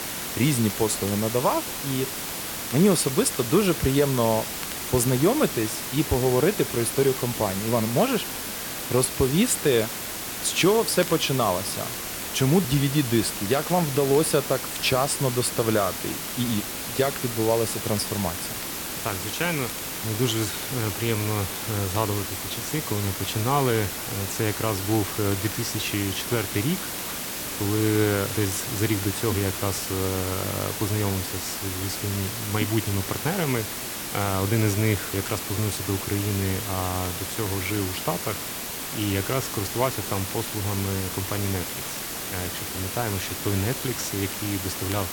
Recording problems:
hiss; loud; throughout; 4 dB below the speech
crackle, like an old record; faint; 25 dB below the speech

